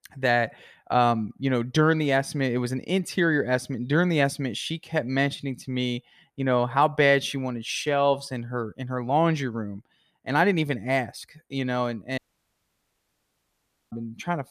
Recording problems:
audio cutting out; at 12 s for 1.5 s

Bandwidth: 14.5 kHz